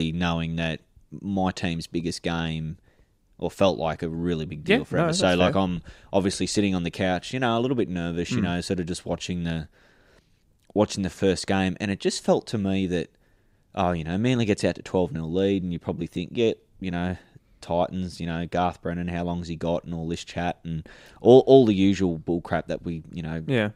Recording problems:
abrupt cut into speech; at the start

